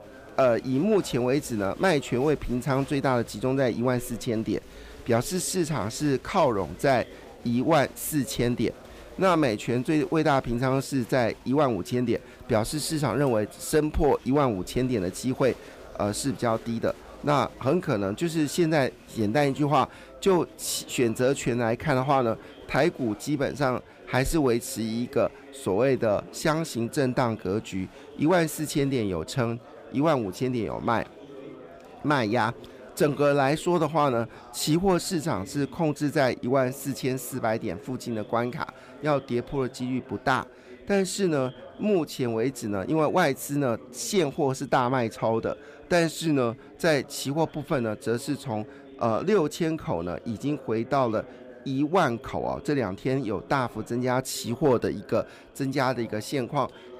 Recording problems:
chatter from many people; faint; throughout; 20 dB below the speech

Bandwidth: 15 kHz